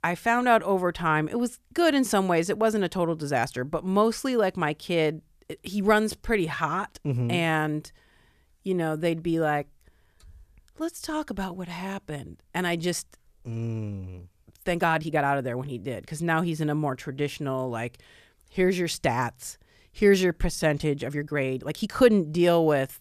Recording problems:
uneven, jittery; strongly; from 3.5 to 22 s

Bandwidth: 14.5 kHz